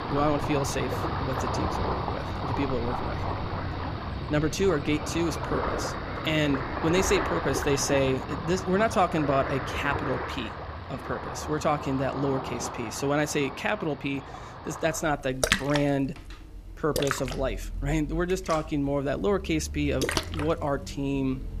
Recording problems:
rain or running water; loud; throughout; 4 dB below the speech

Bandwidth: 14.5 kHz